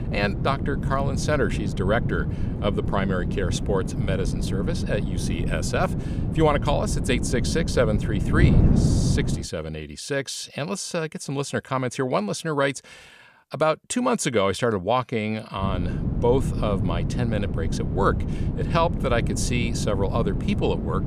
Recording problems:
wind noise on the microphone; heavy; until 9.5 s and from 16 s on; 9 dB below the speech

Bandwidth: 14.5 kHz